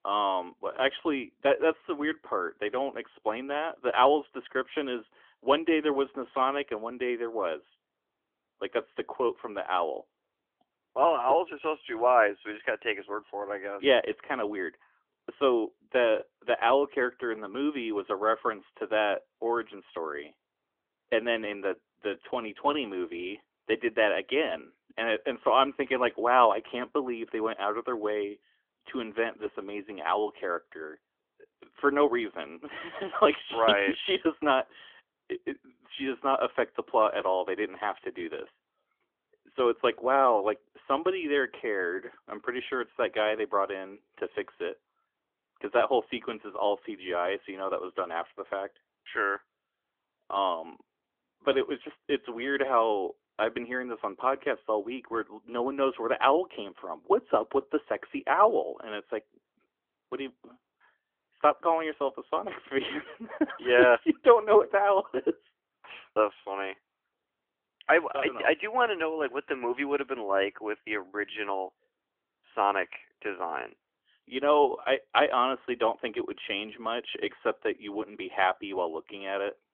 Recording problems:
phone-call audio; nothing above 3.5 kHz

